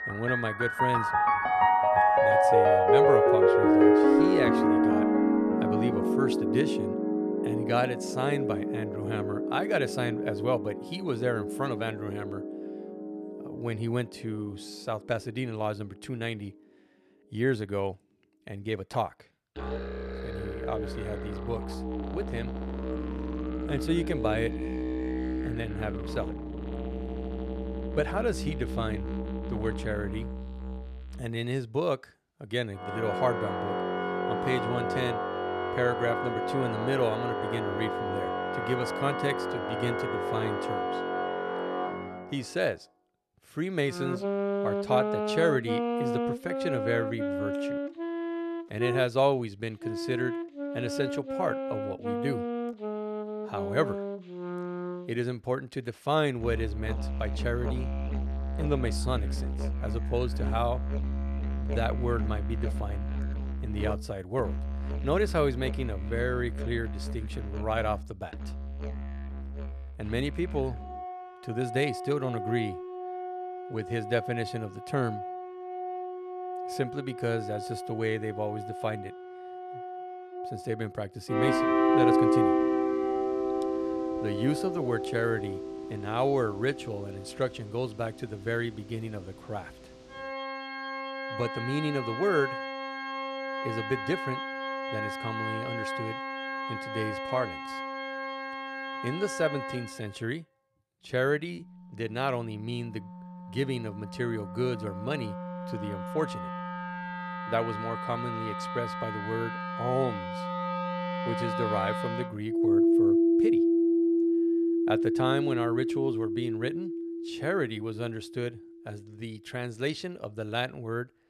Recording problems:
background music; very loud; throughout; 2 dB above the speech

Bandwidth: 13.5 kHz